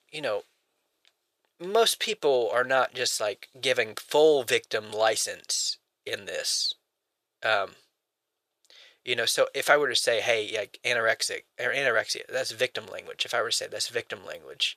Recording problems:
thin; very; fading below 400 Hz

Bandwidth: 14.5 kHz